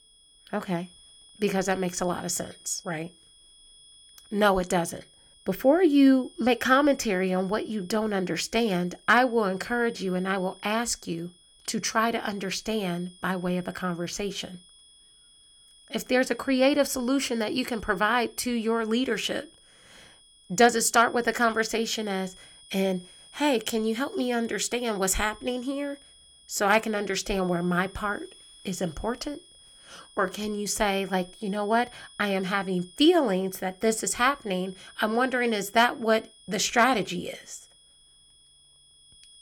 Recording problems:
high-pitched whine; faint; throughout; 3.5 kHz, 25 dB below the speech

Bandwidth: 17.5 kHz